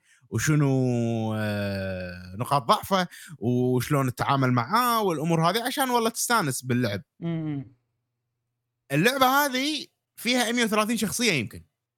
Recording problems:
none

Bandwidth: 17 kHz